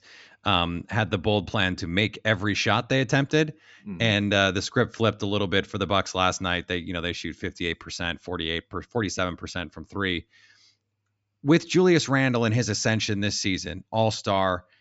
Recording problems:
high frequencies cut off; noticeable; nothing above 8 kHz

